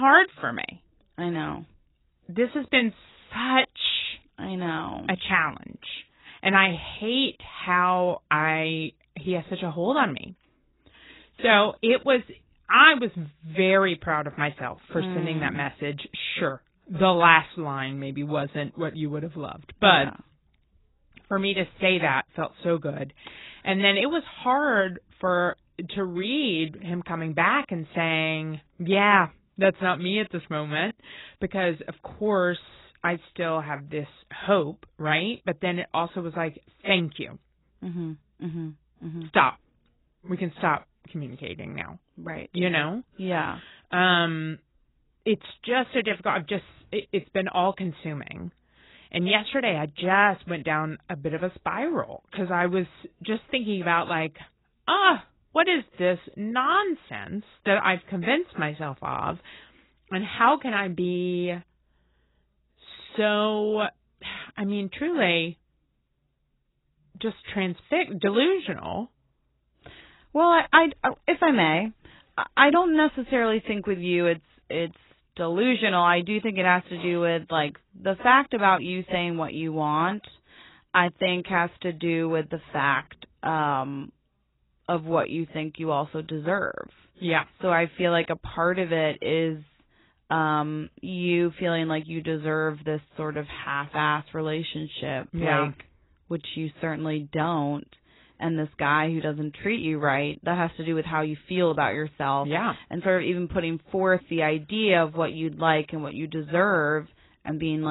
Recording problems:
garbled, watery; badly; nothing above 4 kHz
abrupt cut into speech; at the start and the end

